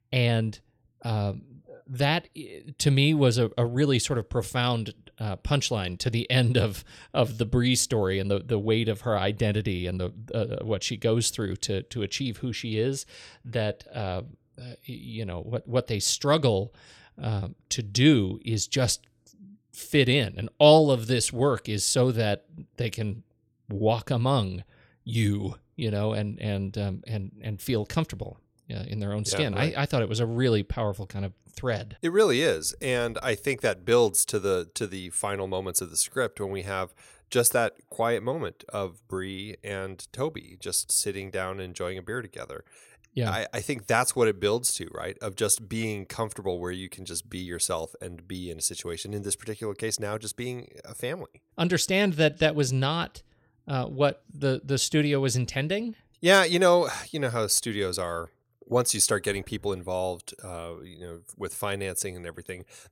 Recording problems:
none

